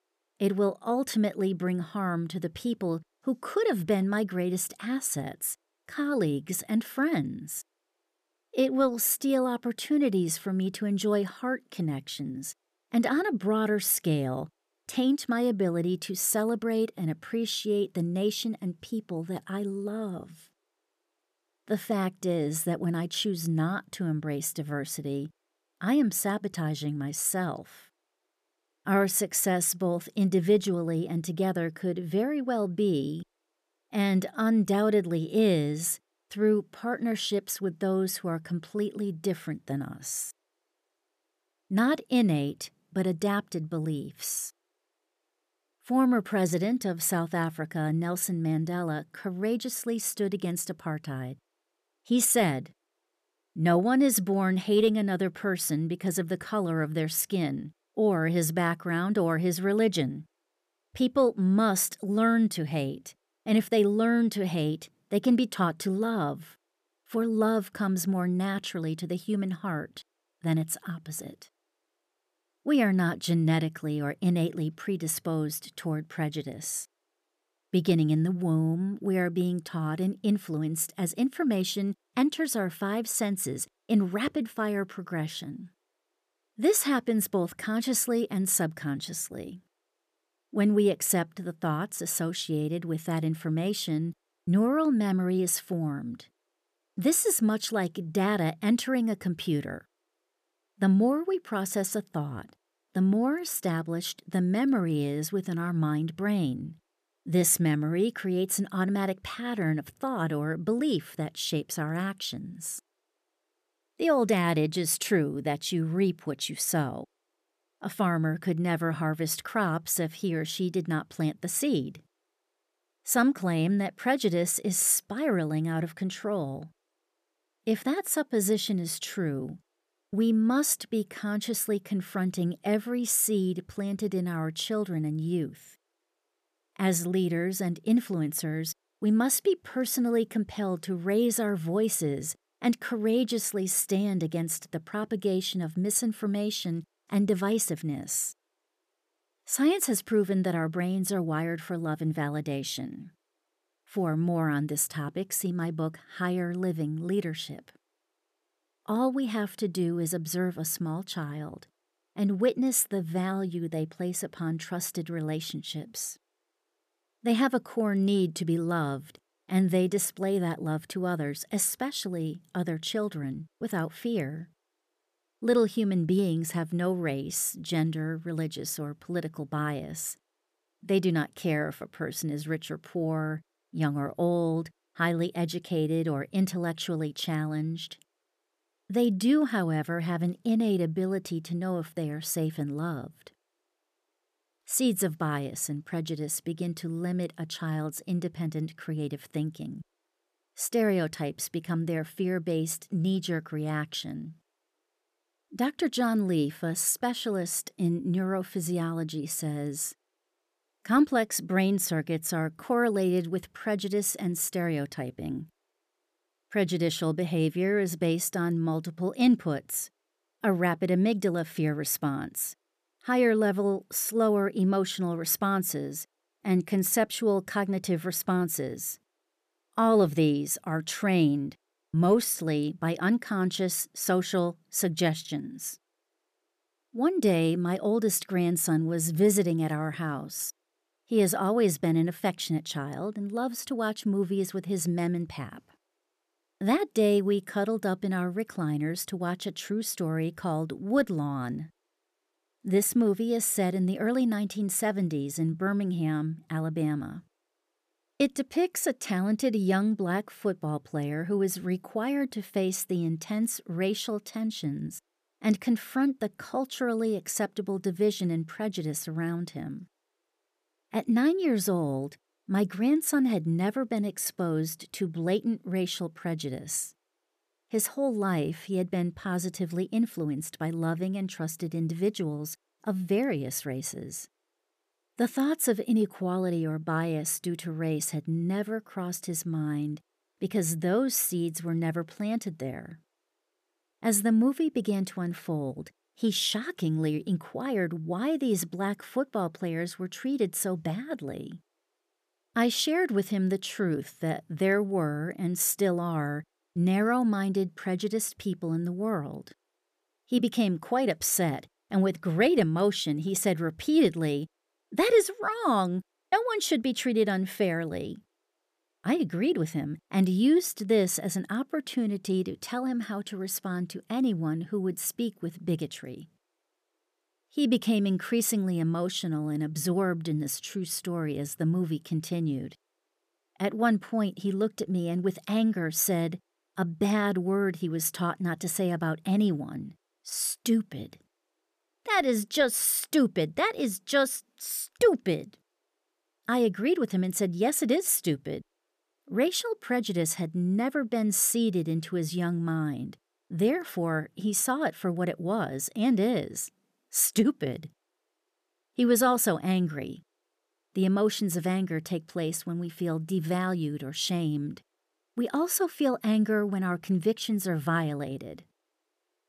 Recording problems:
none

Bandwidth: 14.5 kHz